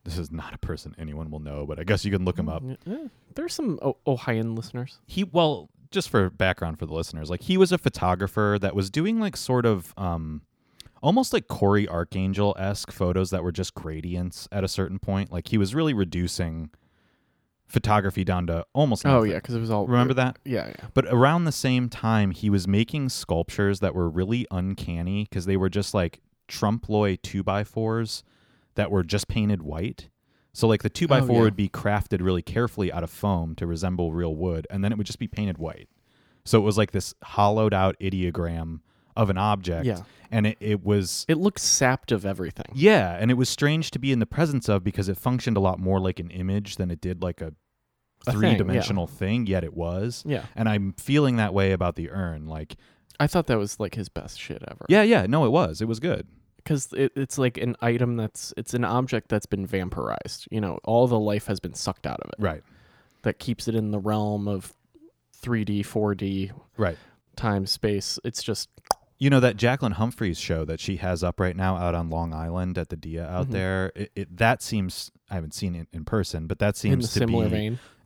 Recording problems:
none

